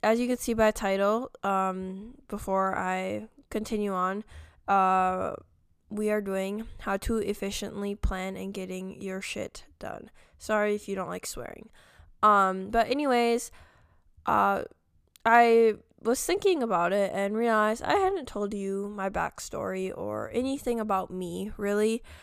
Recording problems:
none

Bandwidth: 14.5 kHz